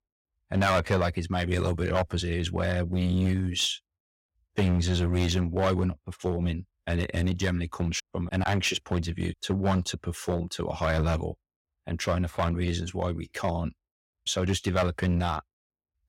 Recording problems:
distortion; slight; 4% of the sound clipped

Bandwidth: 16.5 kHz